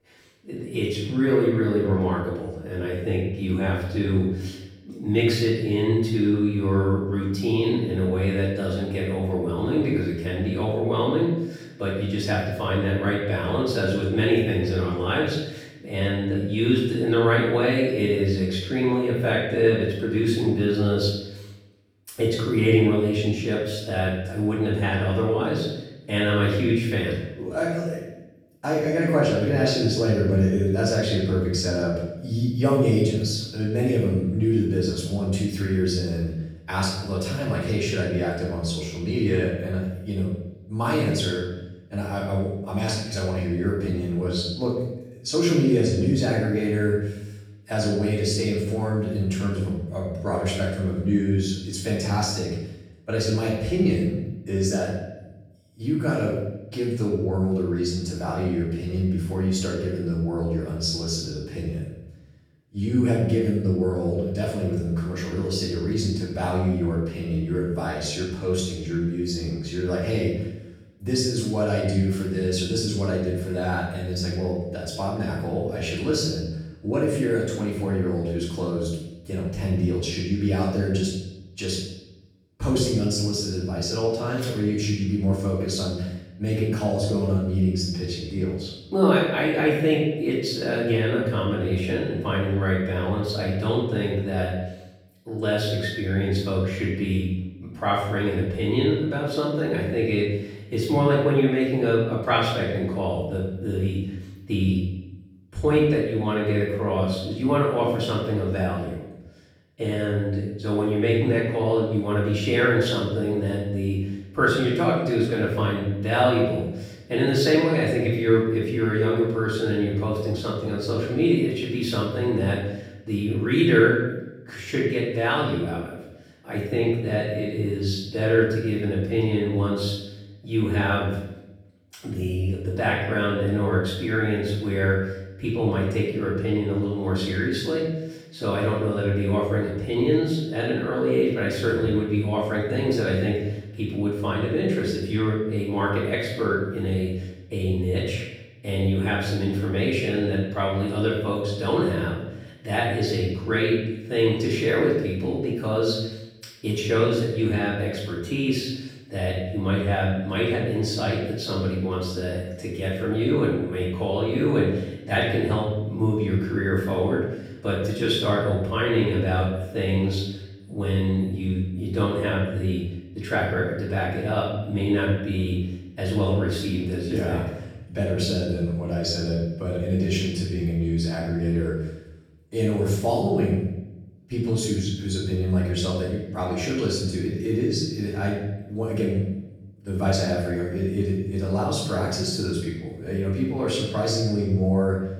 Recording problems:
off-mic speech; far
room echo; noticeable; dies away in 0.8 s

